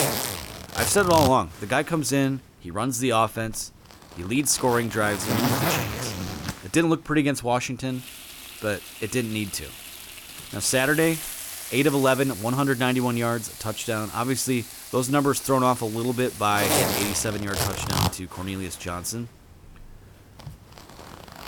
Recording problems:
household noises; loud; throughout; 6 dB below the speech

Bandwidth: 18.5 kHz